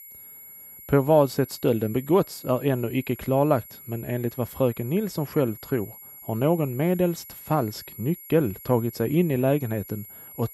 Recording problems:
high-pitched whine; noticeable; throughout; 11.5 kHz, 15 dB below the speech

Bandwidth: 15.5 kHz